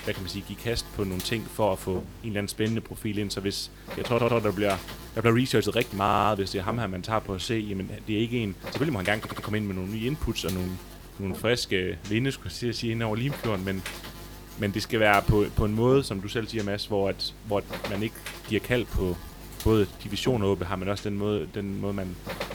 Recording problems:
electrical hum; noticeable; throughout; 50 Hz, 15 dB below the speech
uneven, jittery; strongly; from 2.5 to 22 s
audio stuttering; at 4 s, at 6 s and at 9 s

